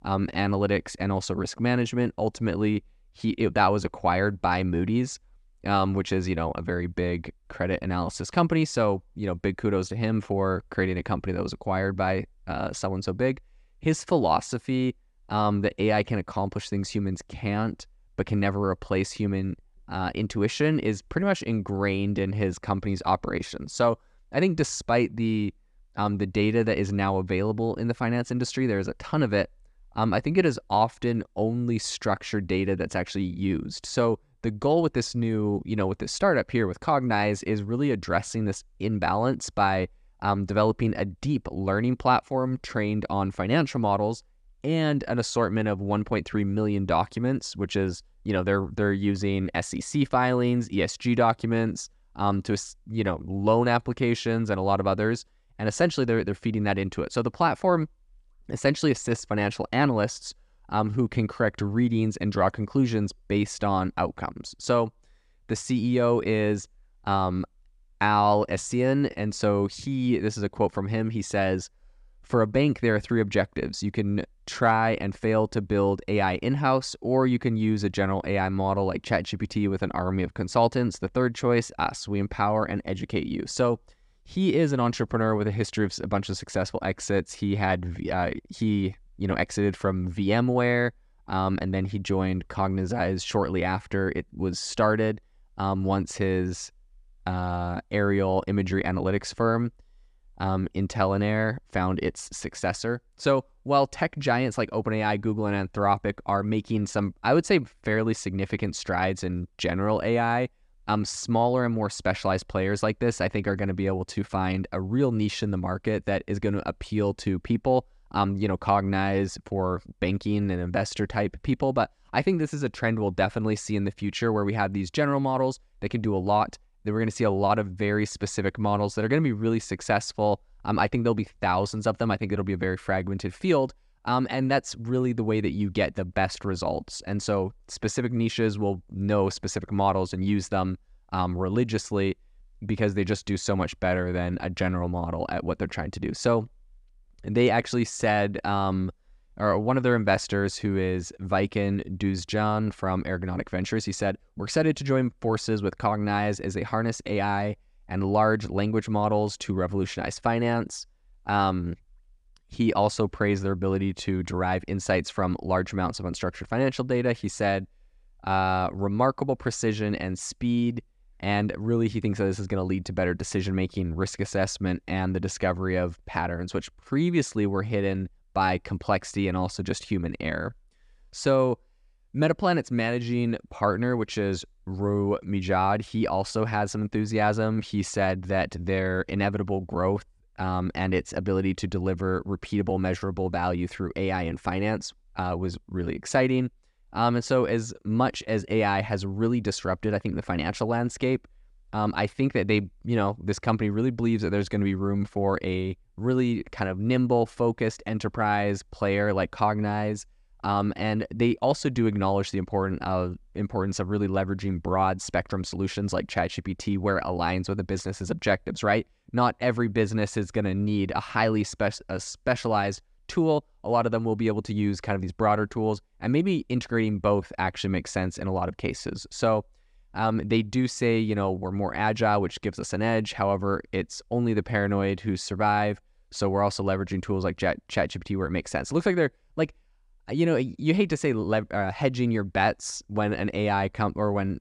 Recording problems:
none

